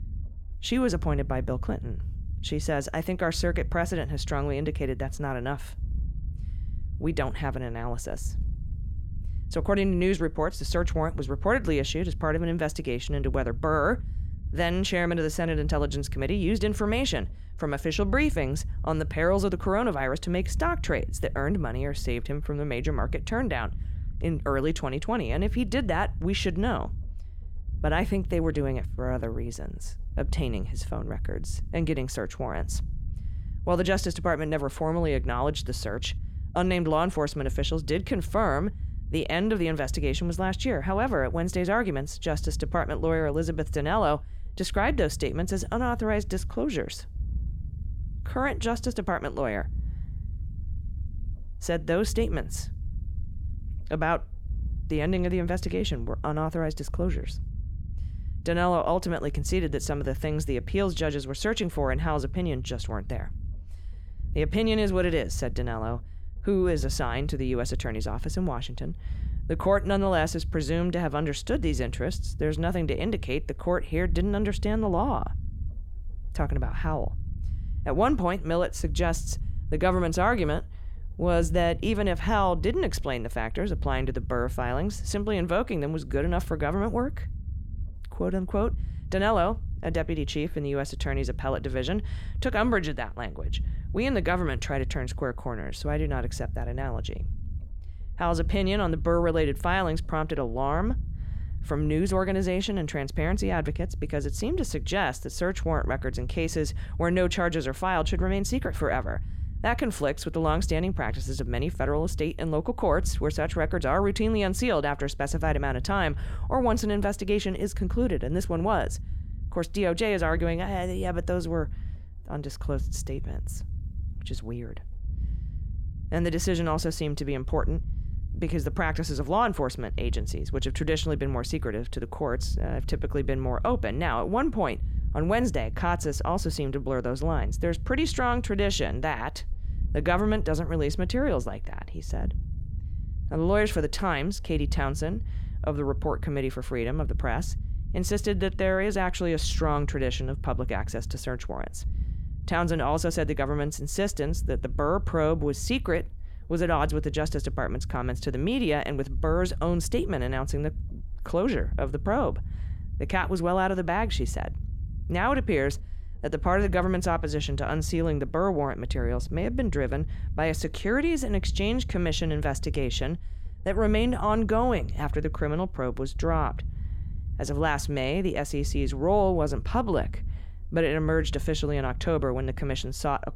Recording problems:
low rumble; faint; throughout; 25 dB below the speech

